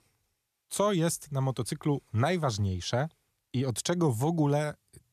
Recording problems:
none

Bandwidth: 14 kHz